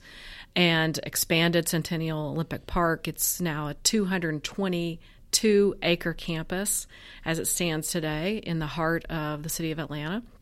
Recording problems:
none

